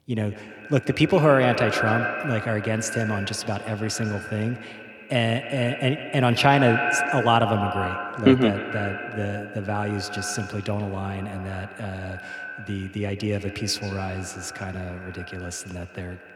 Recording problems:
echo of what is said; strong; throughout; 140 ms later, 6 dB below the speech

